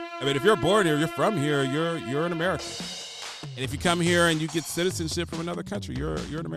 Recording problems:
background music; loud; throughout; 10 dB below the speech
abrupt cut into speech; at the end

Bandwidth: 13.5 kHz